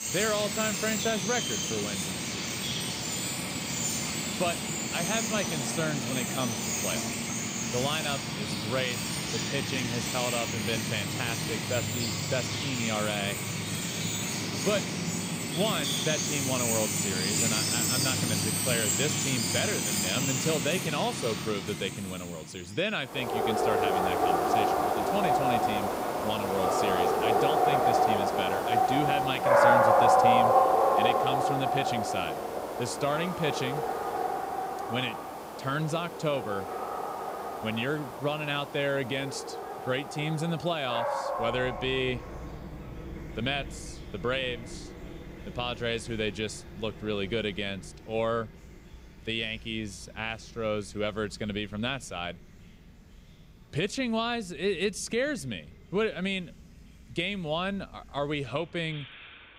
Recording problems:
animal sounds; very loud; throughout; 4 dB above the speech

